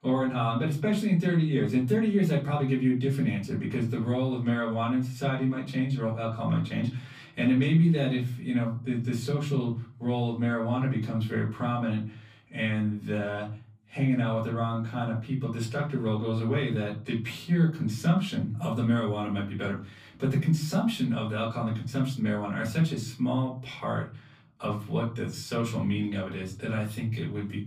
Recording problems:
off-mic speech; far
room echo; slight; dies away in 0.4 s

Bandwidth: 15 kHz